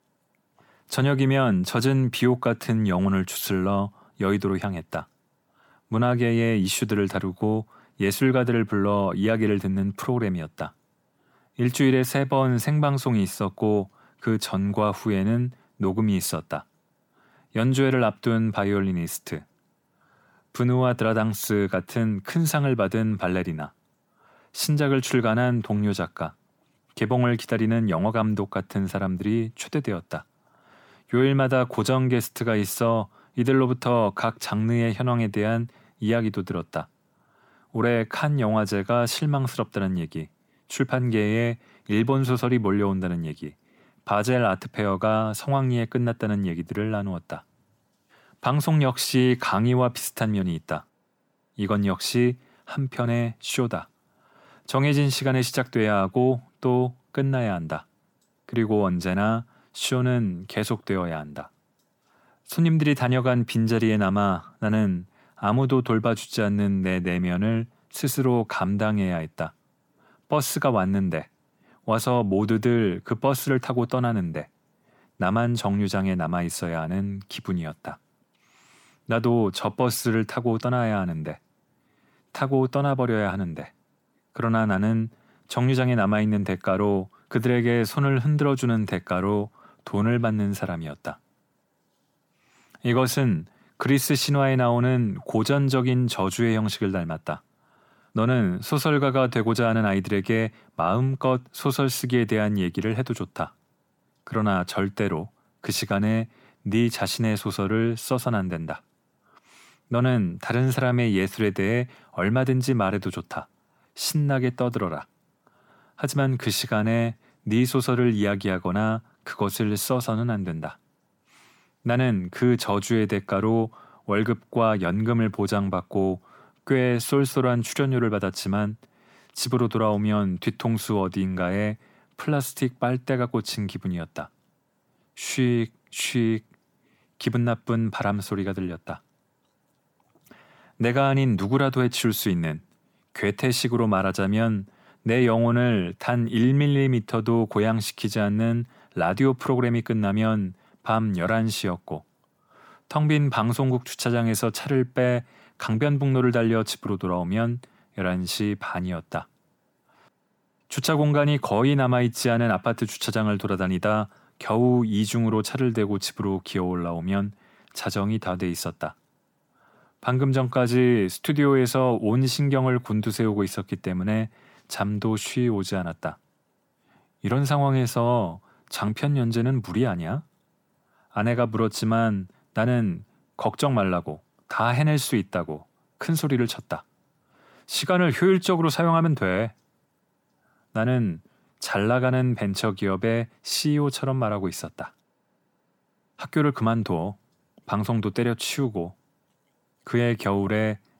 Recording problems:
none

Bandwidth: 18 kHz